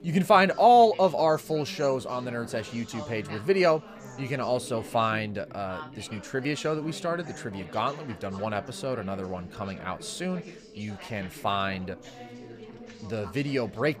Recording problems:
background chatter; noticeable; throughout; 3 voices, 15 dB below the speech

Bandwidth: 15 kHz